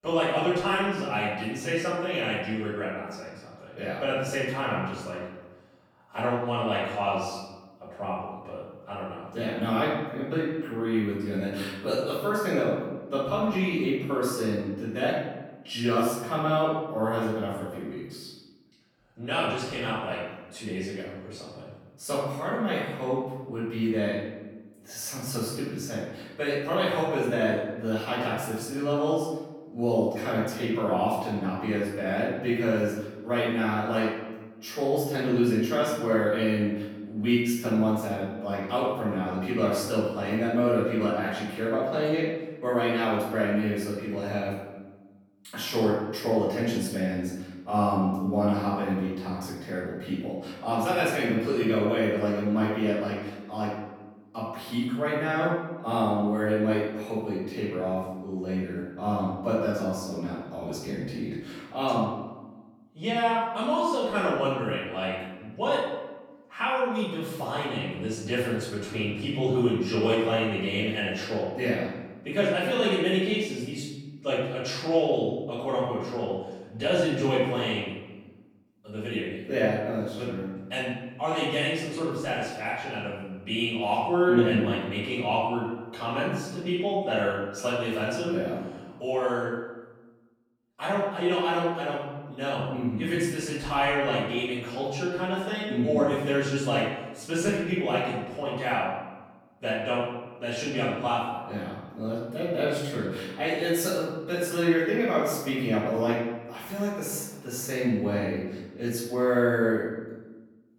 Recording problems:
room echo; strong; dies away in 1.1 s
off-mic speech; far

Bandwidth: 18.5 kHz